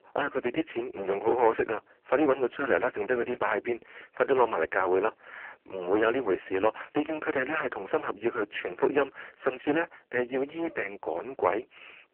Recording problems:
phone-call audio; poor line
distortion; heavy; 10% of the sound clipped

